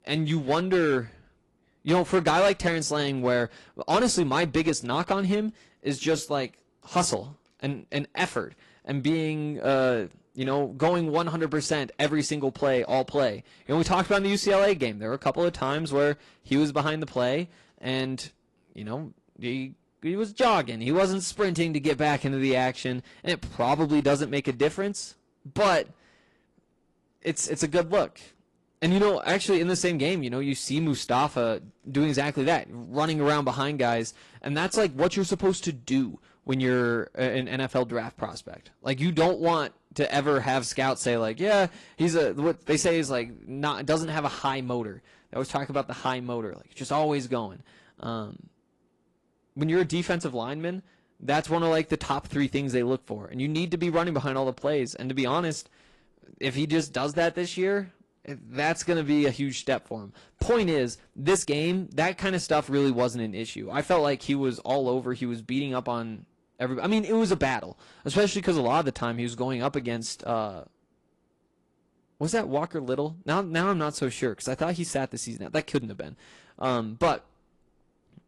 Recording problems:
distortion; slight; 4% of the sound clipped
garbled, watery; slightly

